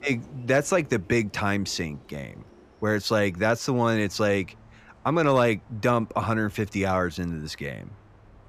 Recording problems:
train or aircraft noise; faint; throughout; 25 dB below the speech

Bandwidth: 14.5 kHz